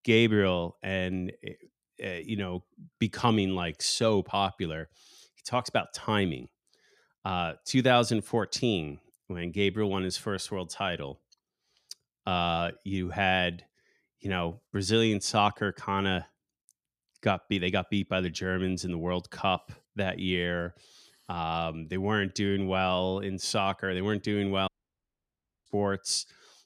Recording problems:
audio cutting out; at 25 s for 1 s

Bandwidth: 14.5 kHz